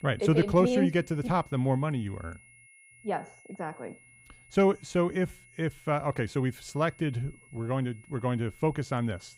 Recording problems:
high-pitched whine; faint; throughout; 2 kHz, 25 dB below the speech

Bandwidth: 15.5 kHz